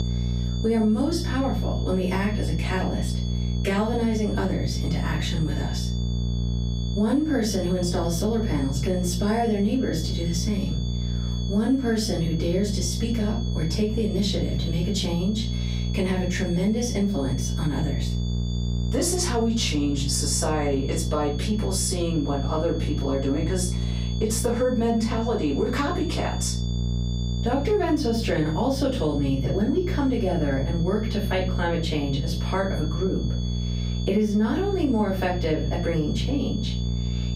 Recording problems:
off-mic speech; far
room echo; slight; dies away in 0.4 s
squashed, flat; somewhat
electrical hum; noticeable; throughout; 60 Hz, 15 dB below the speech
high-pitched whine; noticeable; throughout; 3.5 kHz, 15 dB below the speech

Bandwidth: 15.5 kHz